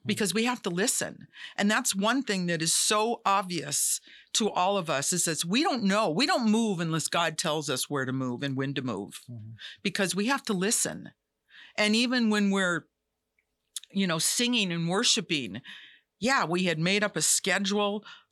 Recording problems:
none

